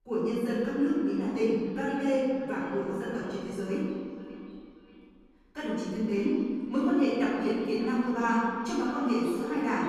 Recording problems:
room echo; strong; dies away in 1.7 s
off-mic speech; far
echo of what is said; noticeable; throughout; 580 ms later, 15 dB below the speech

